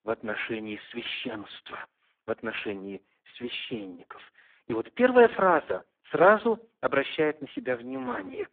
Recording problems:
phone-call audio; poor line

